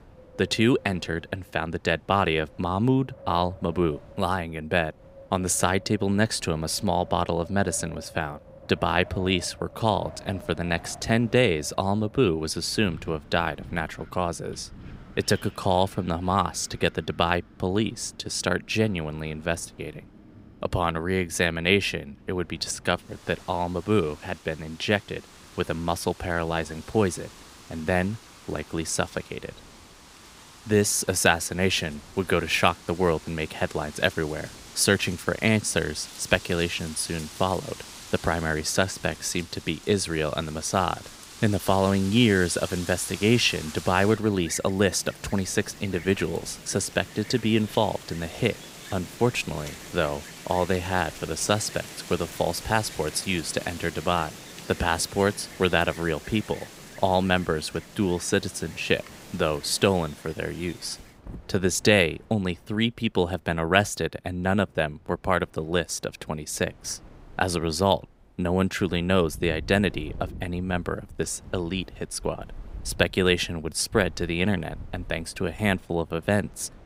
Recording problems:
wind in the background; noticeable; throughout; 20 dB below the speech

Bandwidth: 15.5 kHz